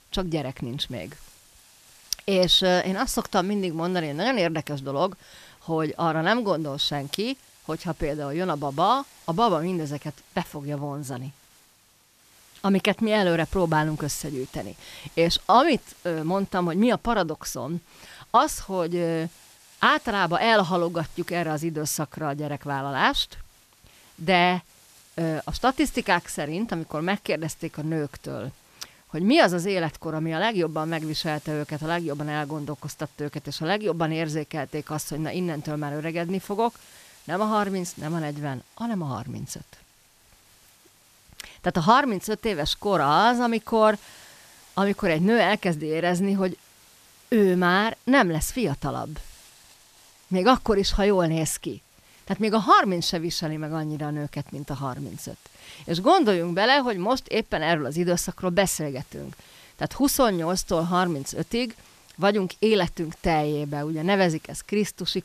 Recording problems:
hiss; faint; throughout; 25 dB below the speech

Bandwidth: 14.5 kHz